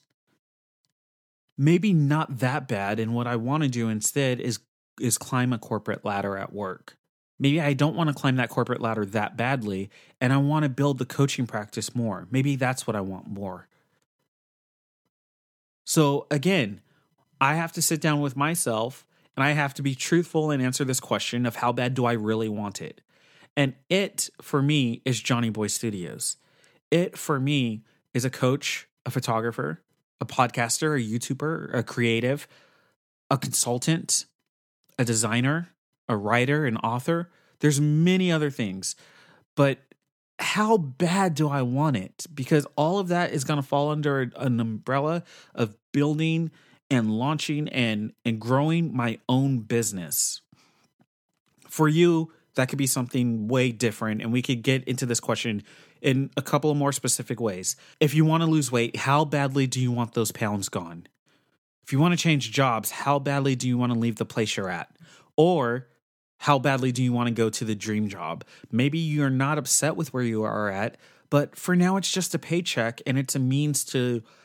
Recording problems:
none

